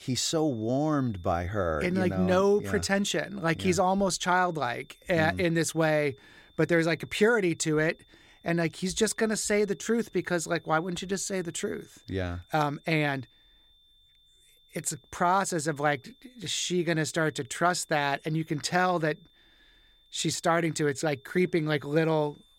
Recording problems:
high-pitched whine; faint; throughout; 3.5 kHz, 30 dB below the speech

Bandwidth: 16 kHz